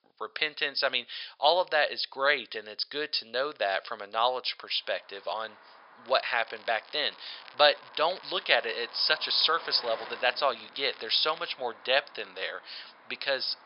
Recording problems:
thin; very; fading below 750 Hz
high frequencies cut off; noticeable; nothing above 5.5 kHz
traffic noise; faint; from 5 s on; 20 dB below the speech
crackling; faint; from 6 to 12 s; 25 dB below the speech

